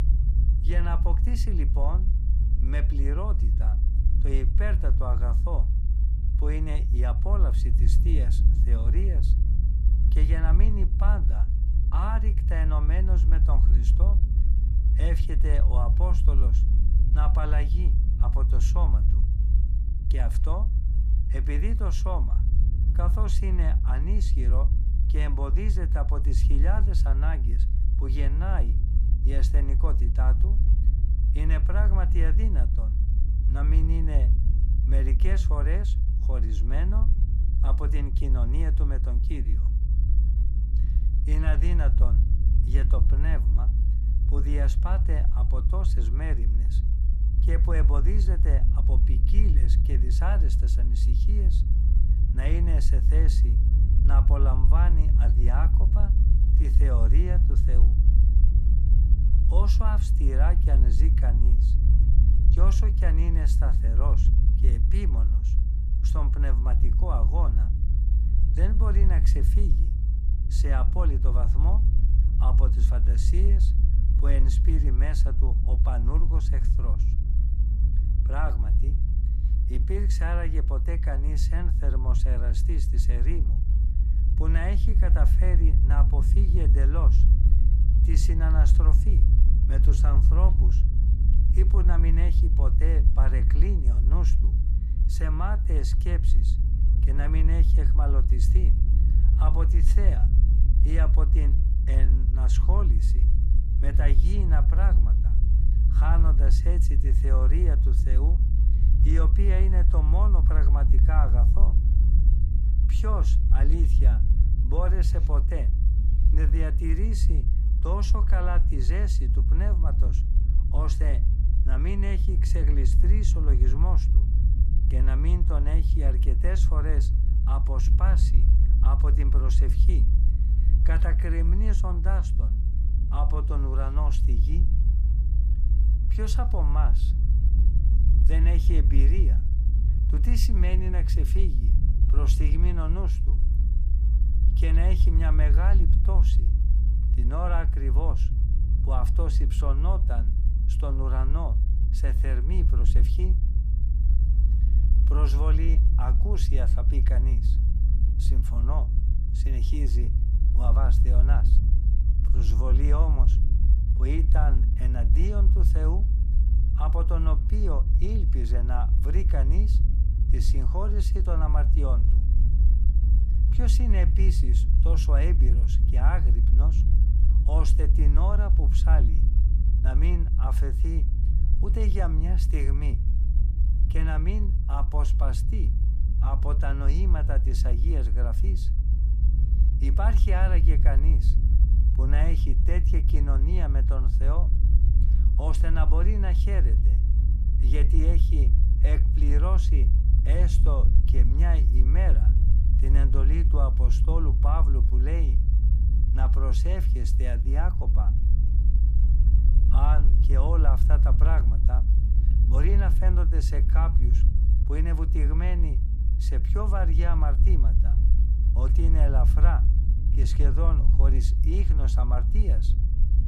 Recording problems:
low rumble; loud; throughout; 5 dB below the speech

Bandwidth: 15 kHz